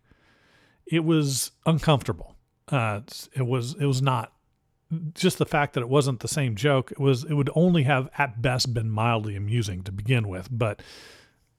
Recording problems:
none

